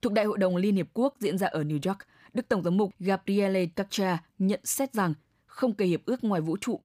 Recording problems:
none

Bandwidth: 15 kHz